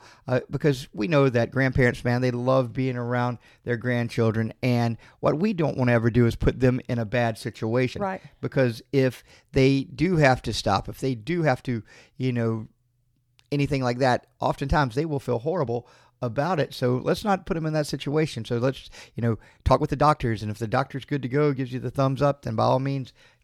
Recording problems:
uneven, jittery; strongly; from 1 to 20 s

